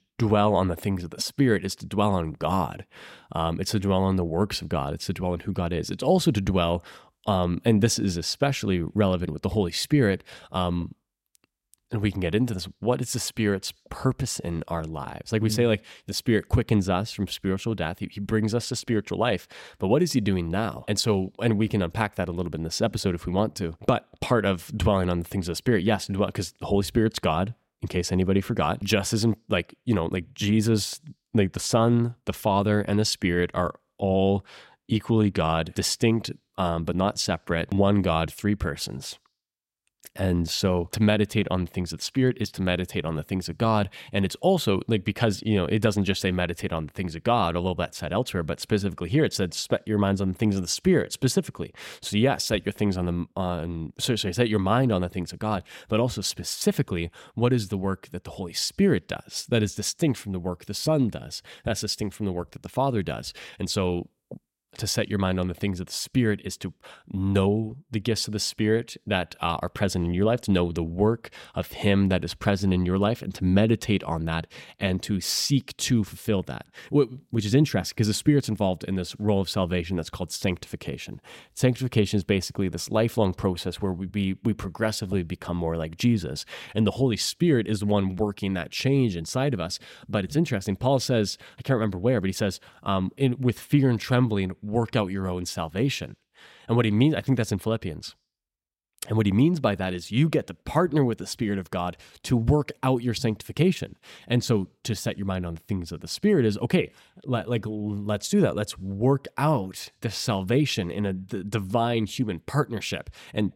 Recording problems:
none

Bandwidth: 16 kHz